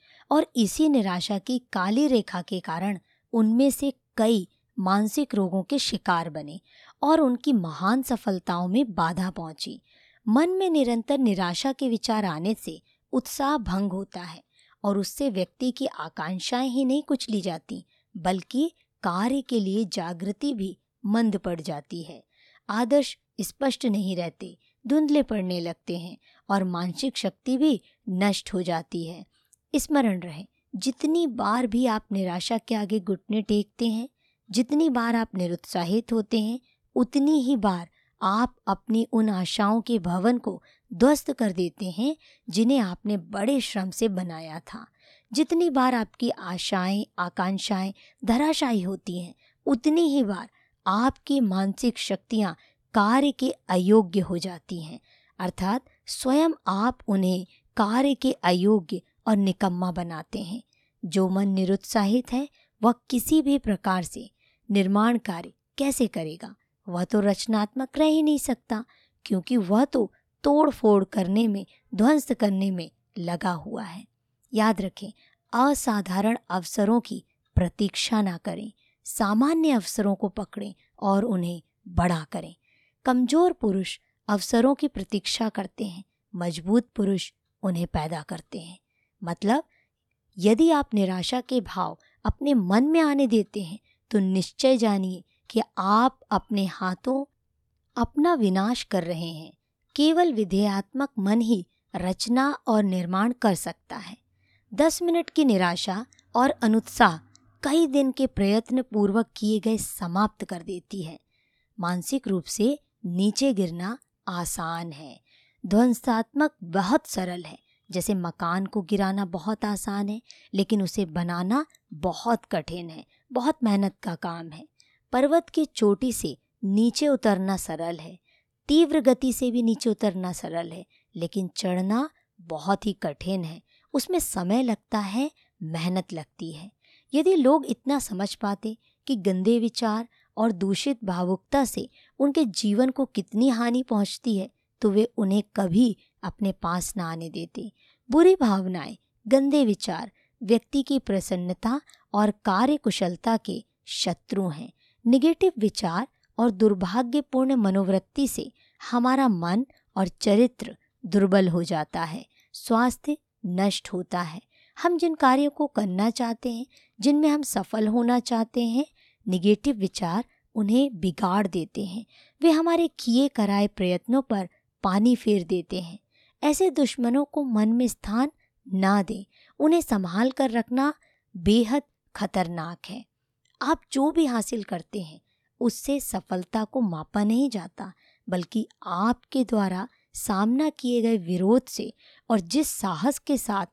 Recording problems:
none

